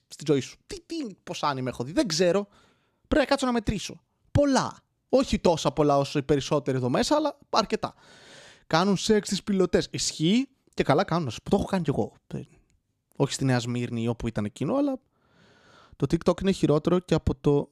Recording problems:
none

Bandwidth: 14.5 kHz